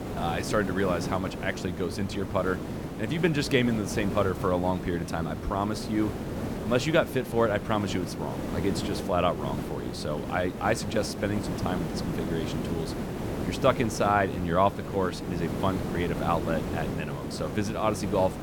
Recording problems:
hiss; loud; throughout; 5 dB below the speech

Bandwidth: 18 kHz